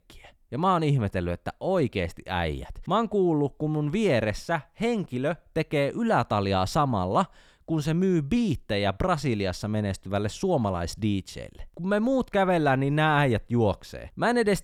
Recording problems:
none

